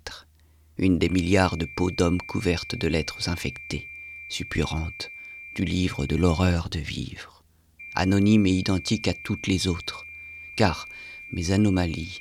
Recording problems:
high-pitched whine; noticeable; from 1 to 6.5 s and from 8 s on; 2.5 kHz, 15 dB below the speech

